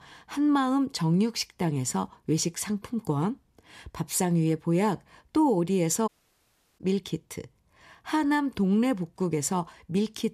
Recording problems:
audio cutting out; at 6 s for 0.5 s

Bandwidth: 14.5 kHz